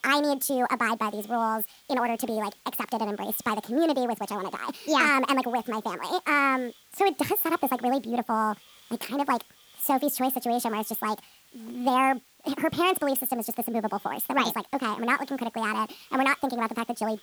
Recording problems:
wrong speed and pitch; too fast and too high; 1.6 times normal speed
hiss; faint; throughout; 25 dB below the speech

